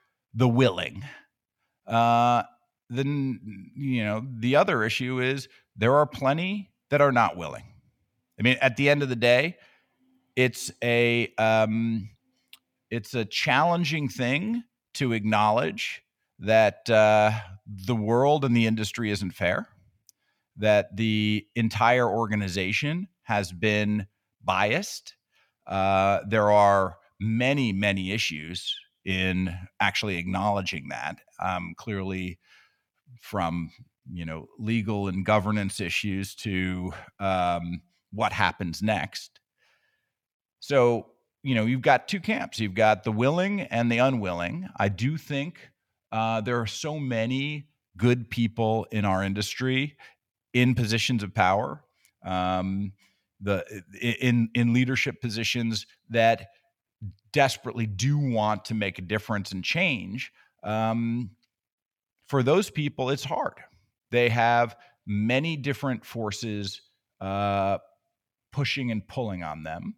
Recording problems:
none

